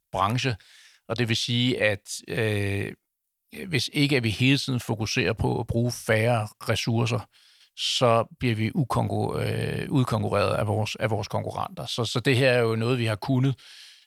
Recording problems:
none

